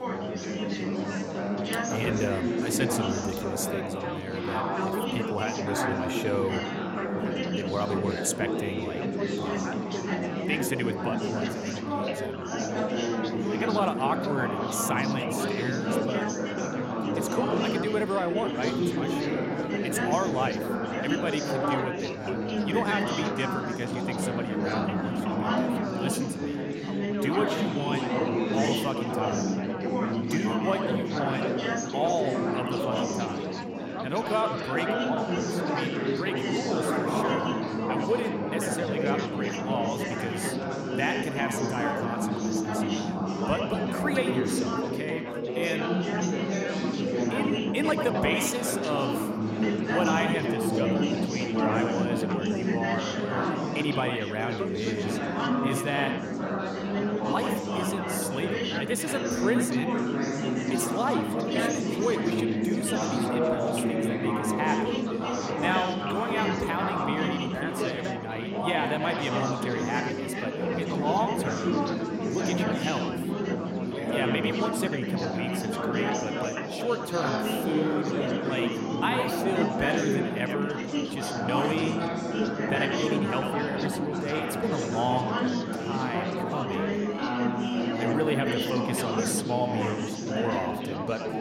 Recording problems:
echo of what is said; strong; from 25 s on; 90 ms later, 8 dB below the speech
chatter from many people; very loud; throughout; 3 dB above the speech

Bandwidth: 16 kHz